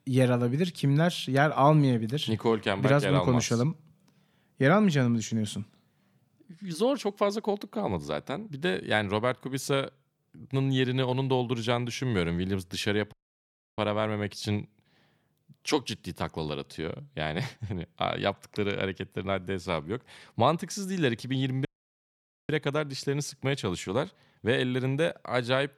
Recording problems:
audio cutting out; at 13 s for 0.5 s and at 22 s for 1 s

